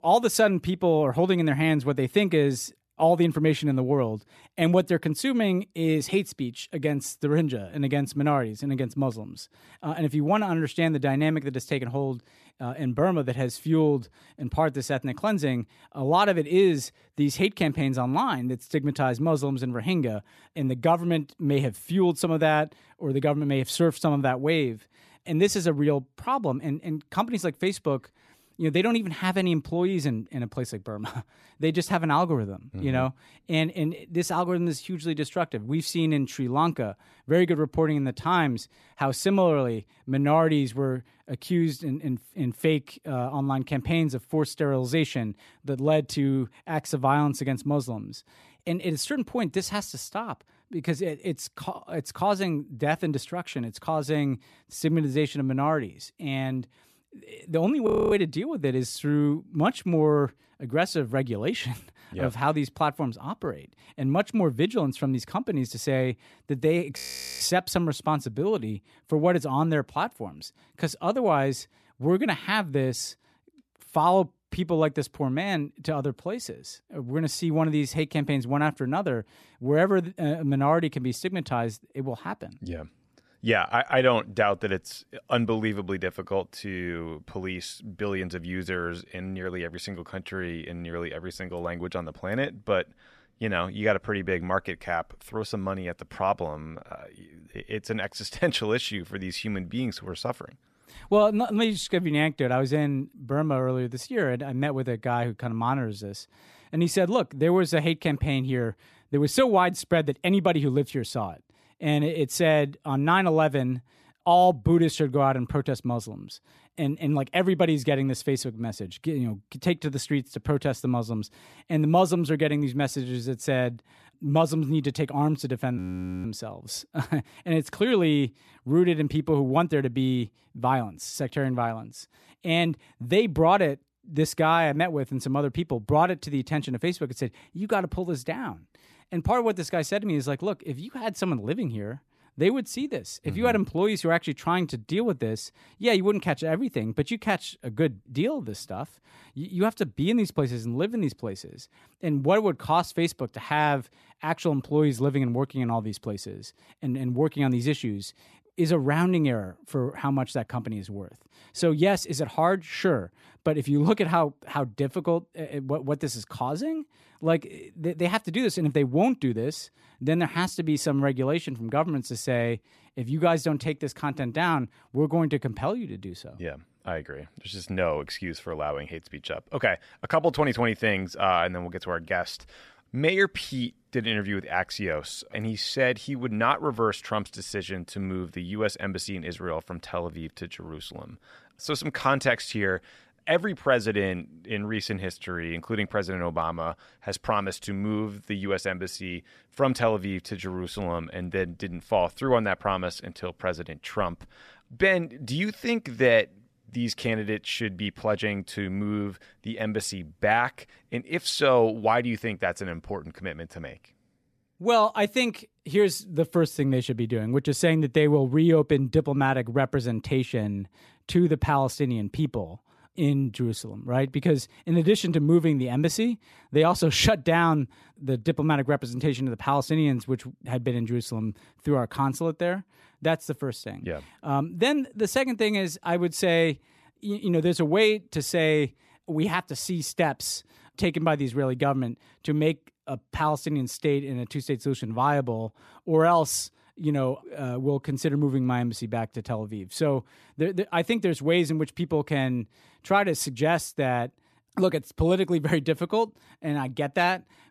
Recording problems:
audio freezing; at 58 s, at 1:07 and at 2:06

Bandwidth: 14 kHz